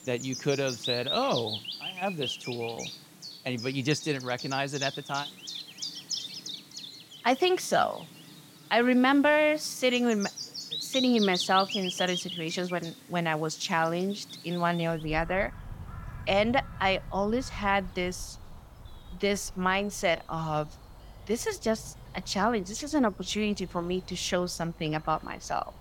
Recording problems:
animal sounds; loud; throughout; 9 dB below the speech

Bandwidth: 17 kHz